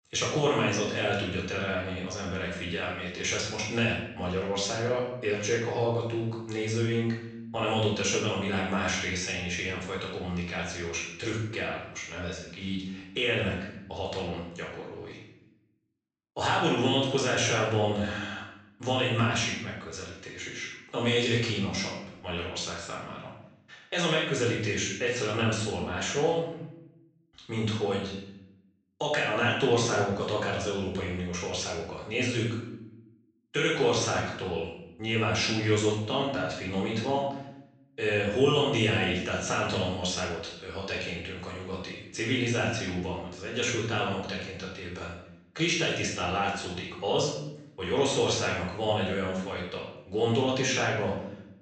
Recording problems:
off-mic speech; far
room echo; noticeable; dies away in 0.7 s
high frequencies cut off; noticeable; nothing above 8 kHz

